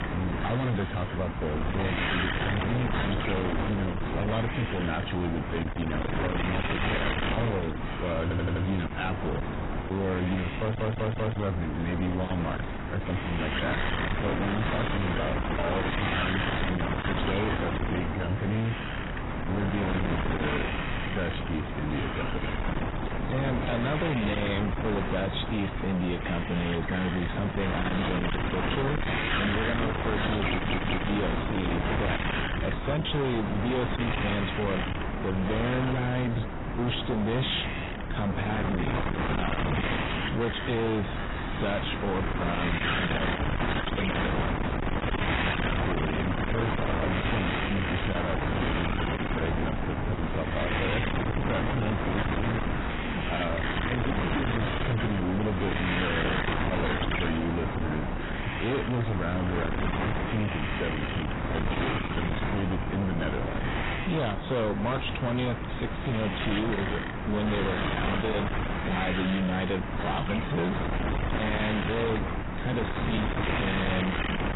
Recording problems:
distortion; heavy; 39% of the sound clipped
garbled, watery; badly; nothing above 4 kHz
wind noise on the microphone; heavy; 1 dB above the speech
animal sounds; noticeable; until 37 s; 15 dB below the speech
audio stuttering; at 8 s, at 11 s and at 31 s

